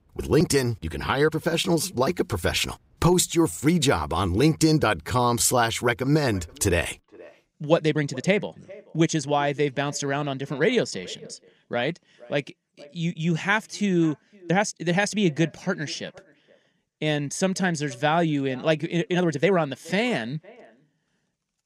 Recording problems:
echo of what is said; faint; from 6 s on; 470 ms later, 25 dB below the speech
uneven, jittery; strongly; from 2 to 20 s

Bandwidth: 15.5 kHz